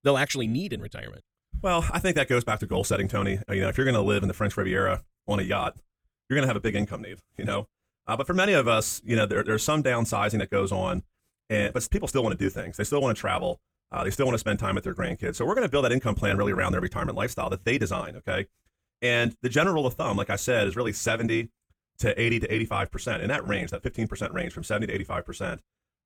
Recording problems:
wrong speed, natural pitch; too fast; 1.5 times normal speed

